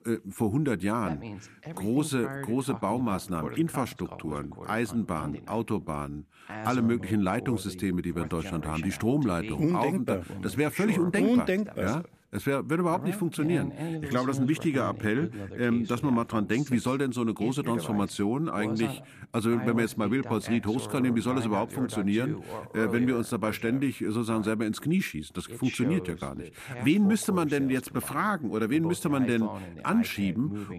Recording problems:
voice in the background; noticeable; throughout; 10 dB below the speech

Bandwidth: 14.5 kHz